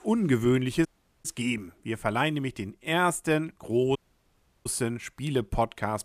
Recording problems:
audio cutting out; at 1 s and at 4 s for 0.5 s

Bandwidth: 14.5 kHz